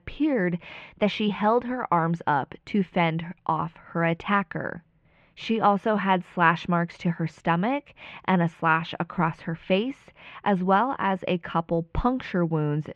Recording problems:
muffled; very; fading above 3 kHz

